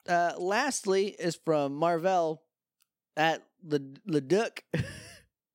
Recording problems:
none

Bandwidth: 16 kHz